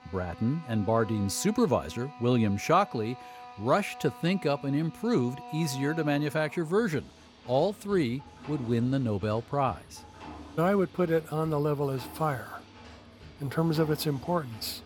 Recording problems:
machinery noise; noticeable; throughout; 20 dB below the speech

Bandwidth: 17.5 kHz